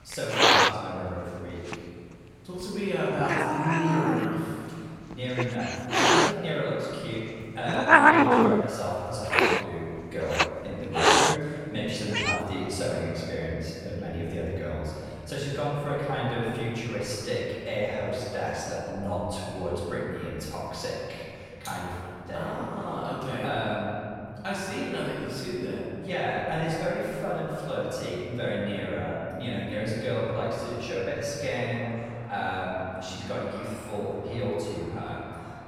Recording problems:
room echo; strong; dies away in 2.3 s
off-mic speech; far
animal sounds; very faint; throughout; 8 dB above the speech

